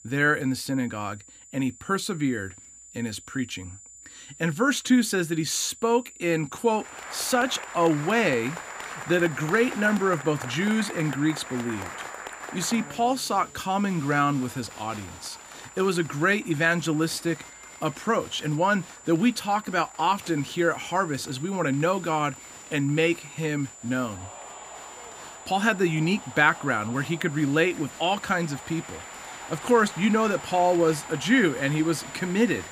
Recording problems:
high-pitched whine; noticeable; throughout; 7 kHz, 20 dB below the speech
crowd noise; noticeable; from 7 s on; 15 dB below the speech

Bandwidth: 15 kHz